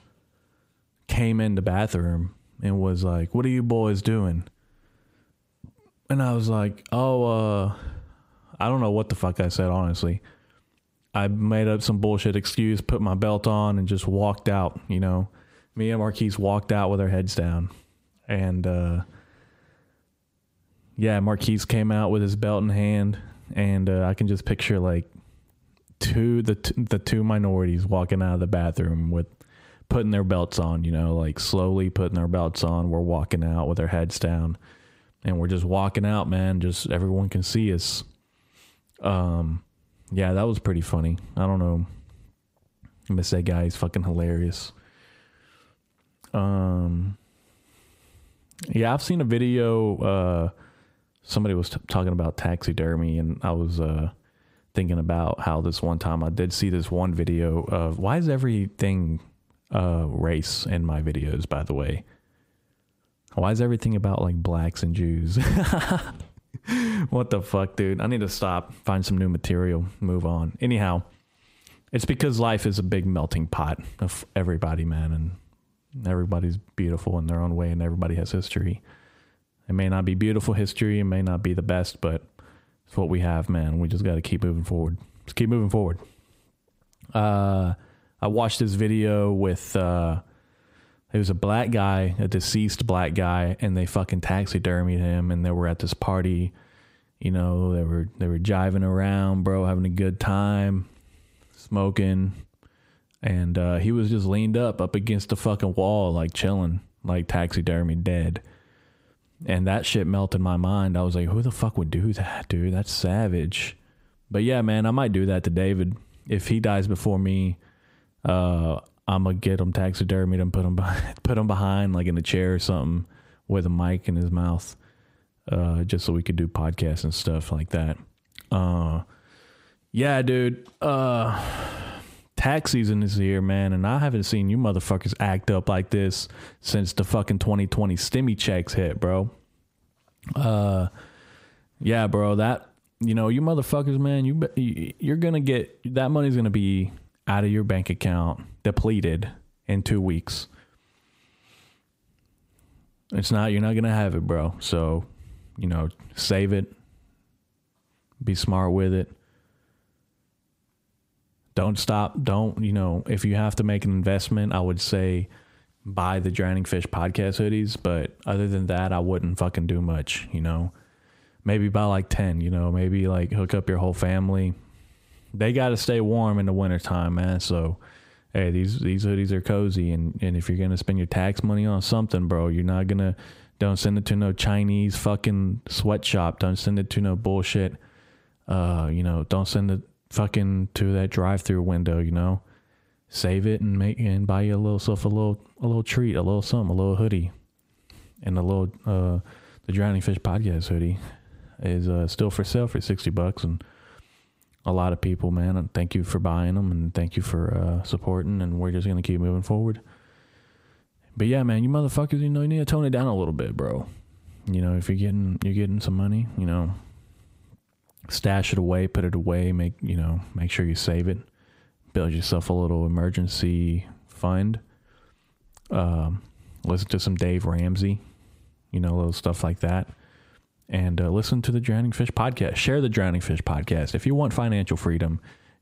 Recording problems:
squashed, flat; heavily

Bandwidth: 15.5 kHz